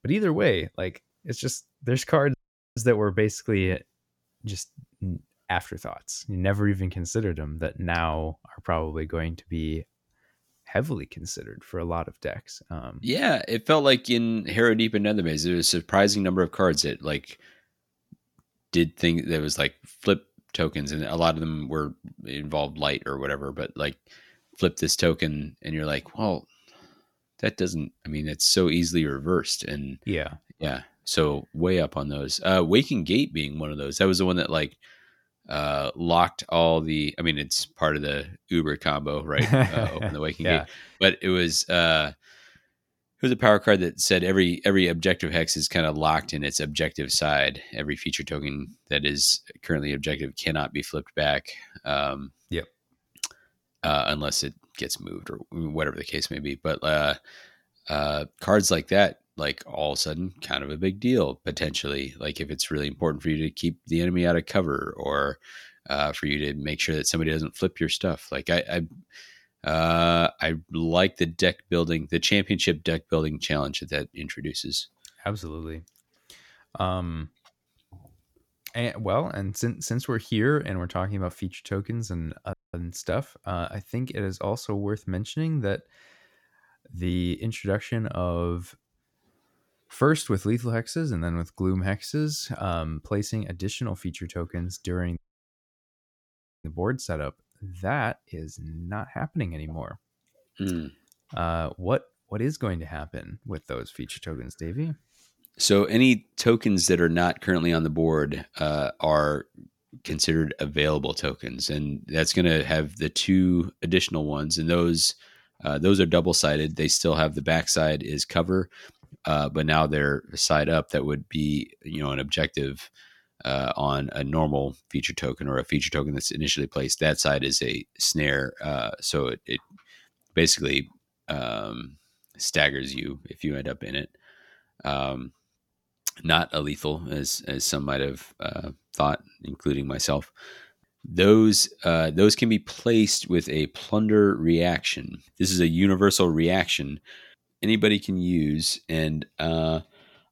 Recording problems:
audio cutting out; at 2.5 s, at 1:23 and at 1:35 for 1.5 s

